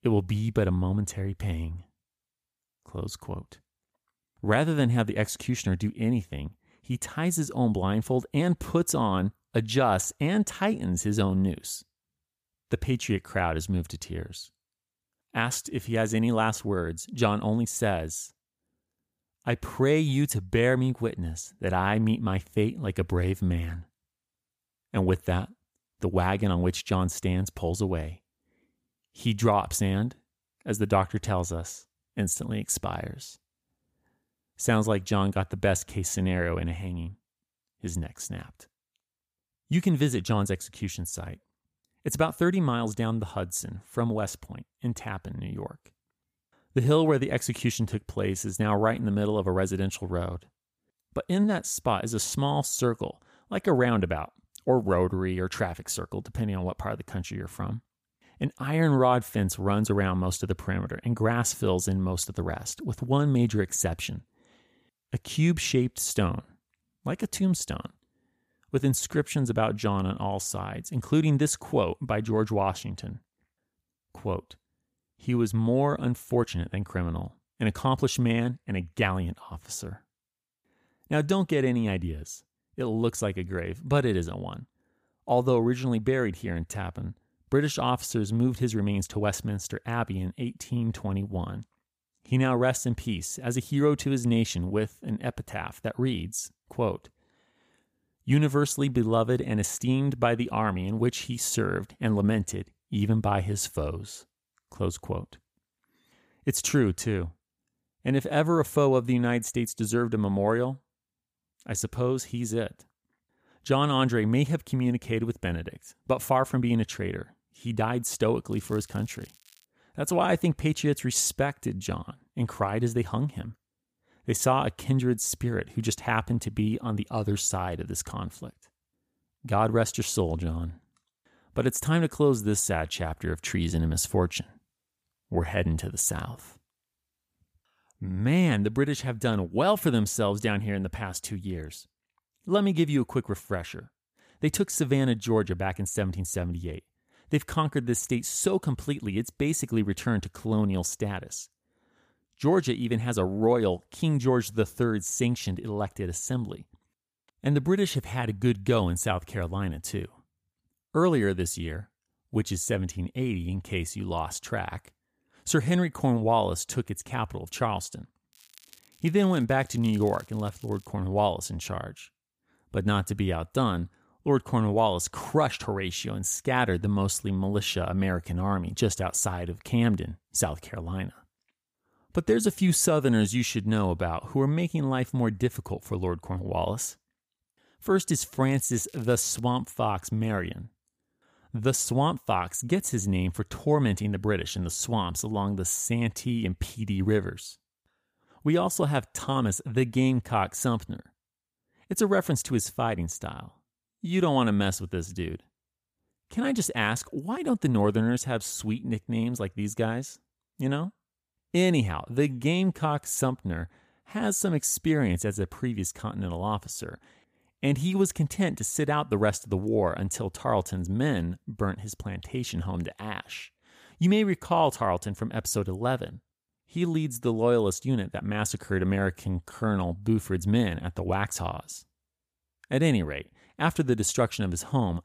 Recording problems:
crackling; faint; from 1:59 to 2:00, from 2:48 to 2:51 and at 3:08; 25 dB below the speech

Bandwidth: 15 kHz